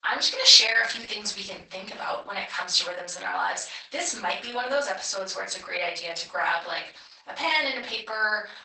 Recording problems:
off-mic speech; far
garbled, watery; badly; nothing above 8 kHz
thin; very; fading below 950 Hz
room echo; slight; dies away in 0.4 s

